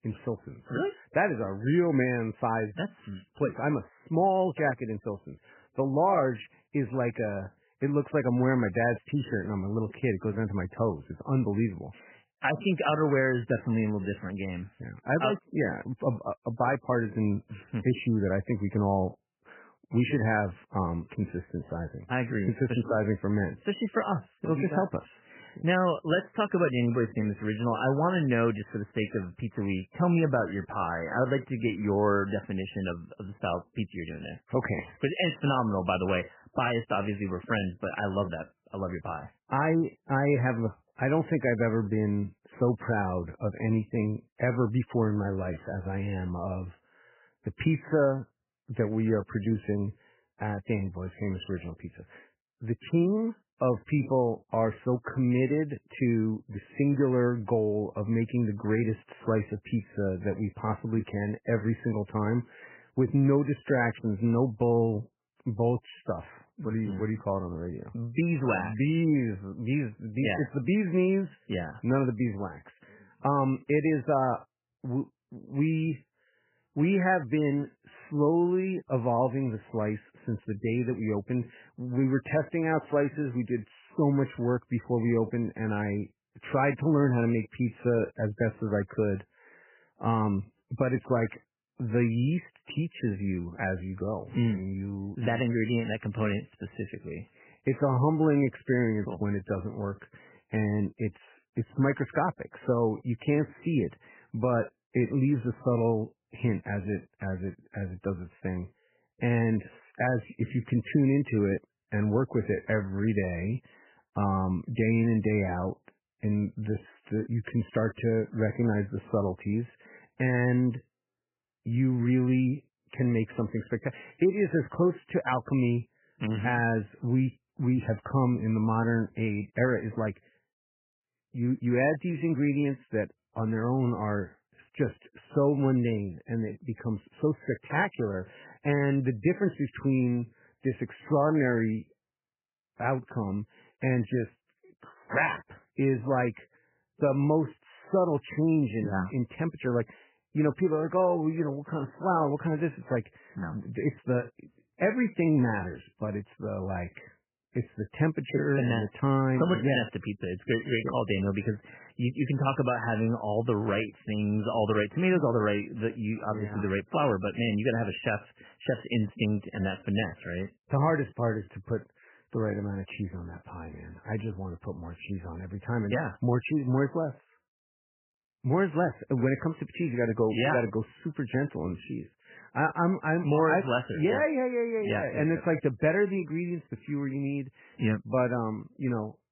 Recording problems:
garbled, watery; badly; nothing above 3 kHz

